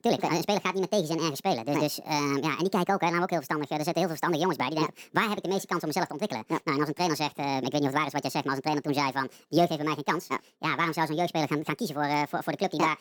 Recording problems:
wrong speed and pitch; too fast and too high; 1.7 times normal speed

